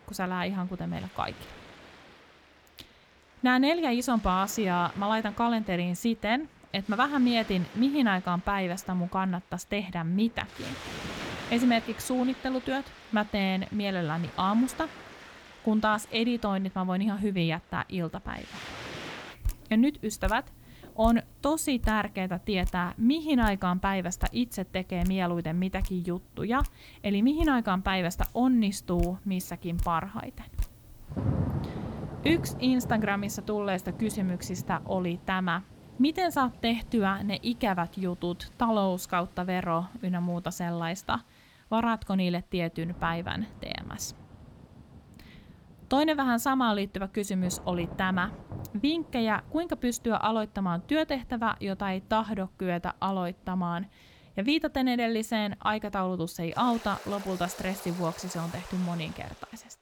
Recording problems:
rain or running water; noticeable; throughout; 15 dB below the speech

